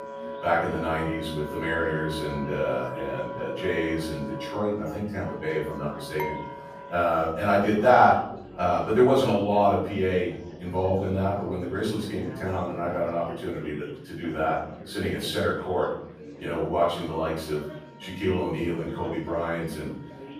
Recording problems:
off-mic speech; far
room echo; noticeable; dies away in 0.6 s
background music; noticeable; throughout; 15 dB below the speech
chatter from many people; noticeable; throughout; 15 dB below the speech
clattering dishes; noticeable; at 6 s; peak 8 dB below the speech

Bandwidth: 15 kHz